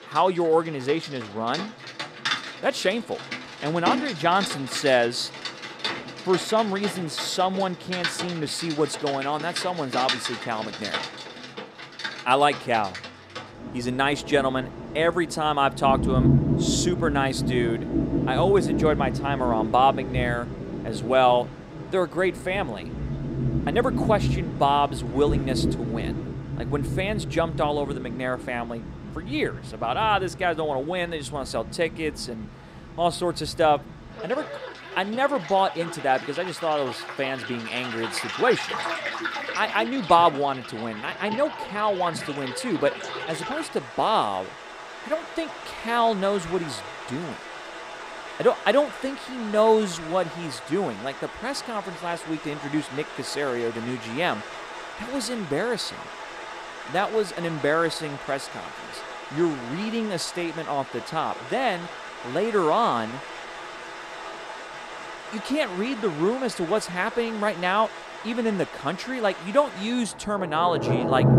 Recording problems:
rain or running water; loud; throughout; 7 dB below the speech

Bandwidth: 15.5 kHz